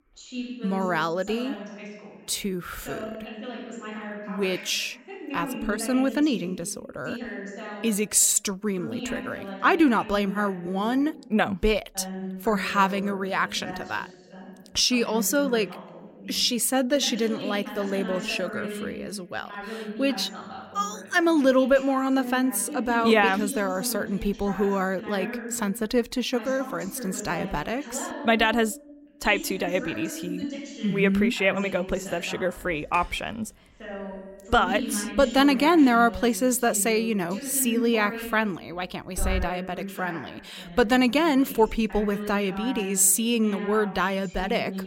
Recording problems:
voice in the background; noticeable; throughout; 10 dB below the speech
alarm; noticeable; from 33 to 39 s; peak 7 dB below the speech

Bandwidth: 16 kHz